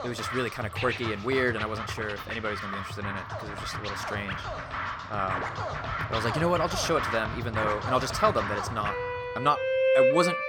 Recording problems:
background music; loud; throughout; 1 dB below the speech

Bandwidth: 18.5 kHz